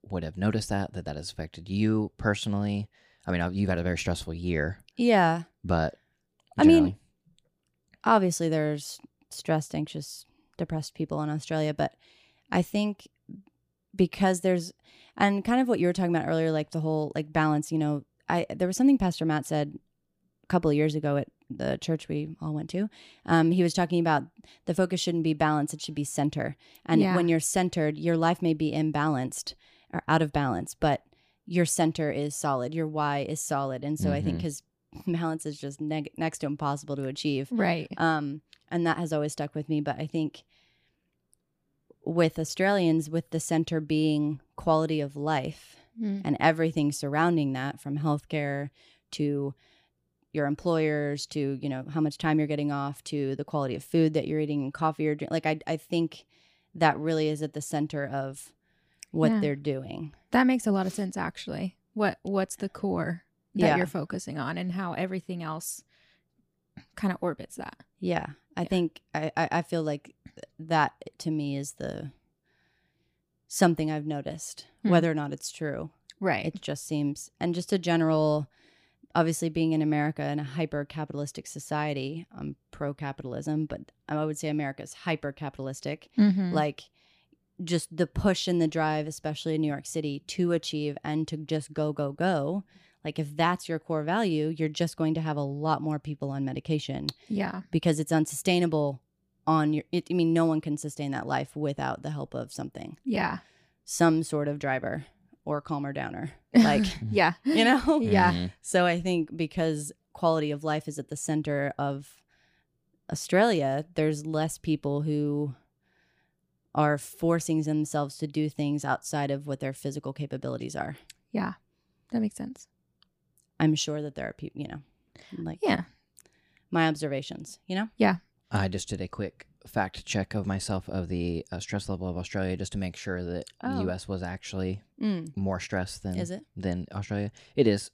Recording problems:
none

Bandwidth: 15 kHz